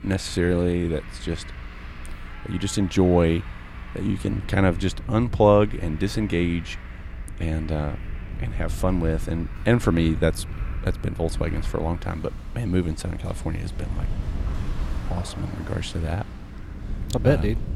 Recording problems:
traffic noise; noticeable; throughout; 20 dB below the speech
electrical hum; faint; throughout; 60 Hz, 30 dB below the speech
low rumble; faint; throughout; 25 dB below the speech

